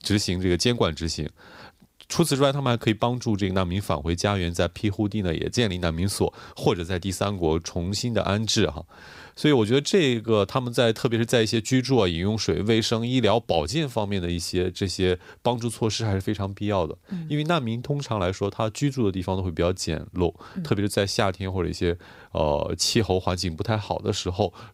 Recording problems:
none

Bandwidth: 15.5 kHz